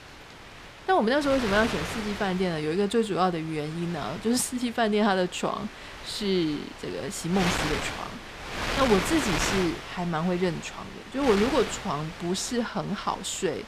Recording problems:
wind noise on the microphone; heavy; 5 dB below the speech

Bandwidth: 14.5 kHz